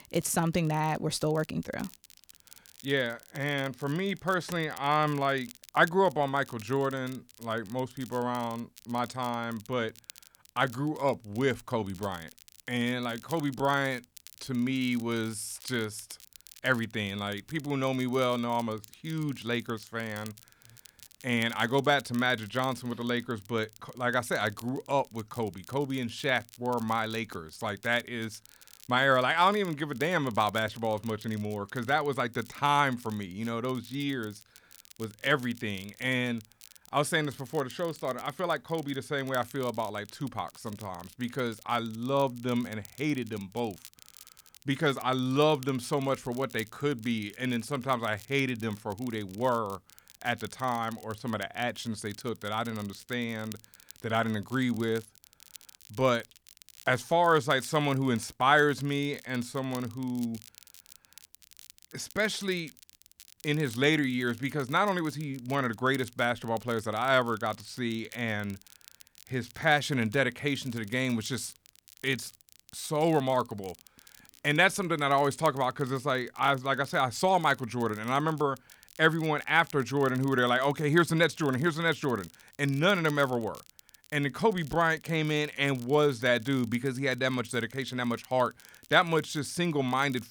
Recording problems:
crackle, like an old record; faint; 20 dB below the speech

